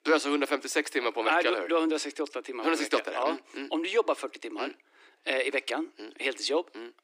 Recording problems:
thin; somewhat; fading below 300 Hz

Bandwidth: 15 kHz